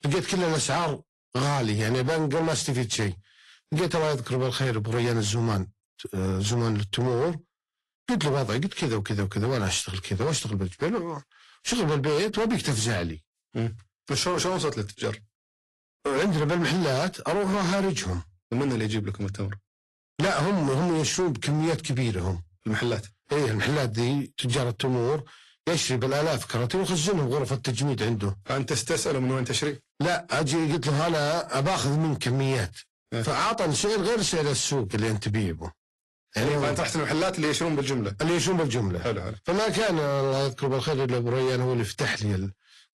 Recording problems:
distortion; heavy; 20% of the sound clipped
garbled, watery; slightly; nothing above 11.5 kHz

